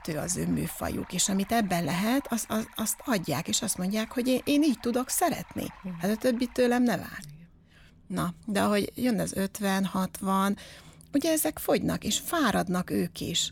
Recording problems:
rain or running water; faint; throughout; 25 dB below the speech

